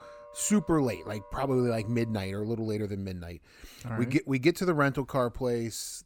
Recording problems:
background music; faint; until 2.5 s; 20 dB below the speech

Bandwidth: 18 kHz